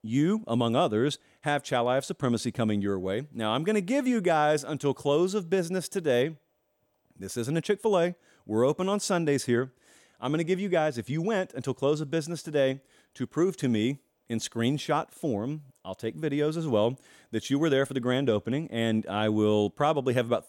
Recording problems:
none

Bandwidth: 16.5 kHz